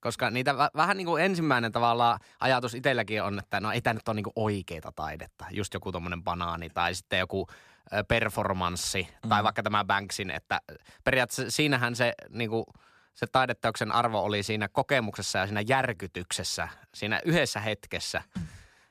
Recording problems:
none

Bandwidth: 14.5 kHz